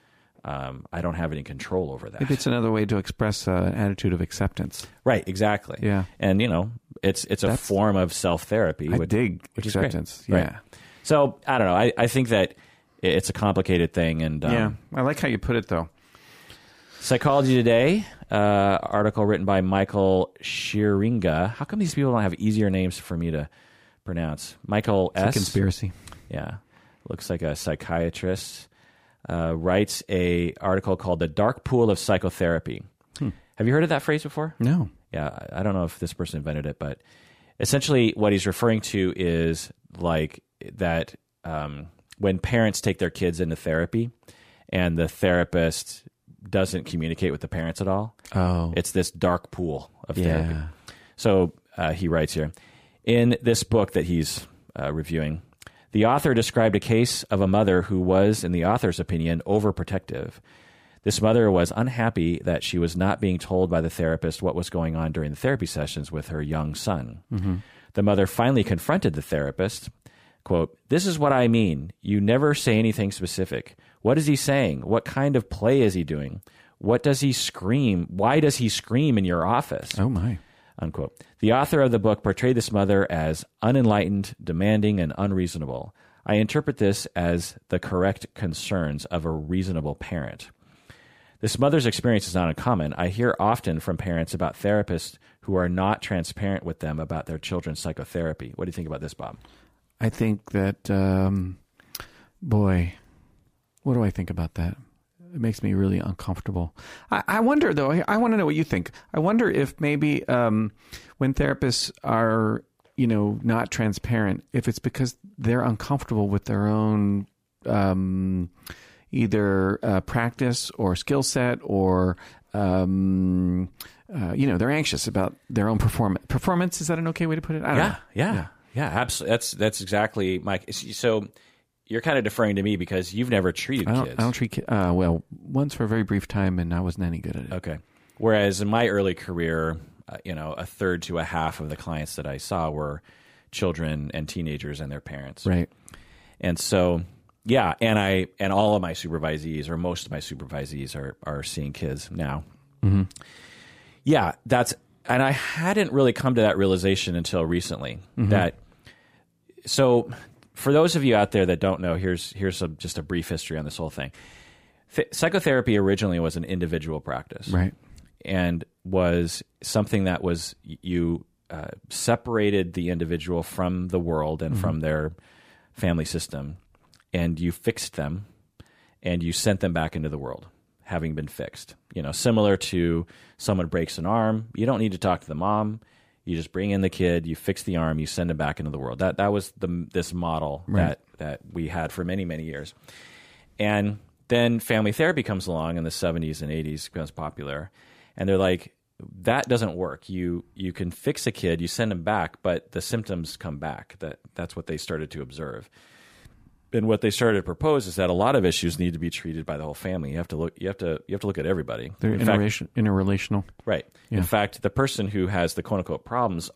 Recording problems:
none

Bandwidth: 15 kHz